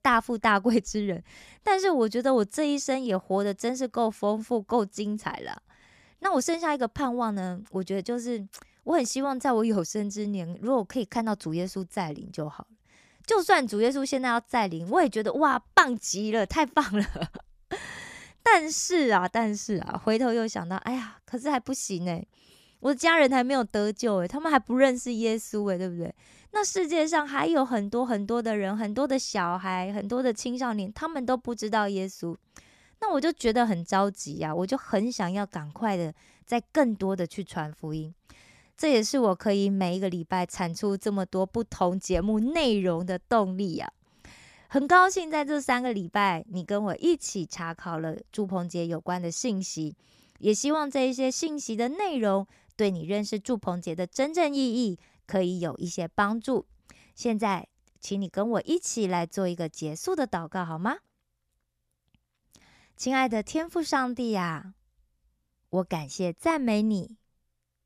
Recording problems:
none

